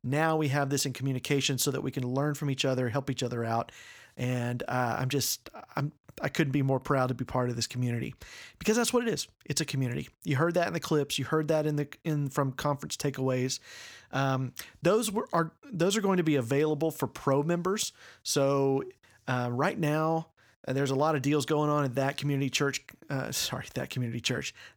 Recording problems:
none

